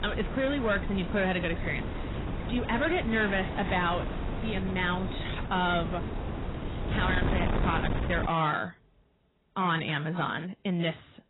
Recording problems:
garbled, watery; badly; nothing above 4 kHz
distortion; slight; 10 dB below the speech
wind noise on the microphone; heavy; until 8.5 s; 8 dB below the speech
rain or running water; noticeable; throughout; 20 dB below the speech

